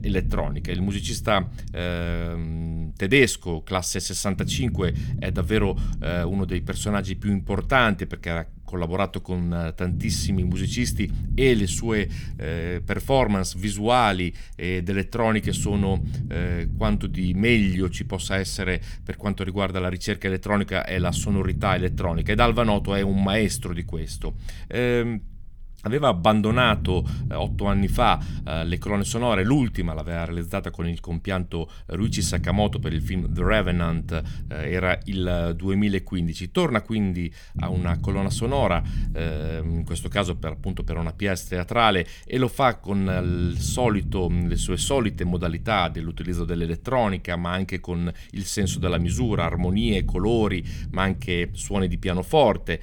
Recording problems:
low rumble; noticeable; throughout; 20 dB below the speech

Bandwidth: 18.5 kHz